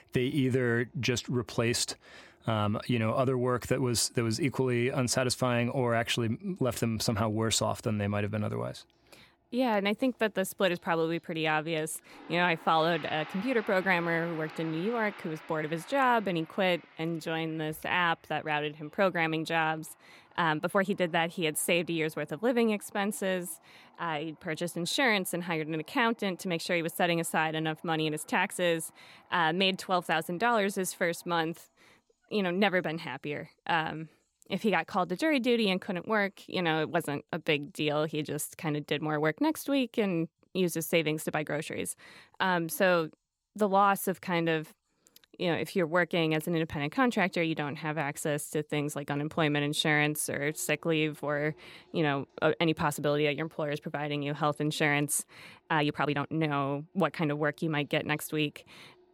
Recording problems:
household noises; faint; throughout; 25 dB below the speech
uneven, jittery; strongly; from 17 to 56 s

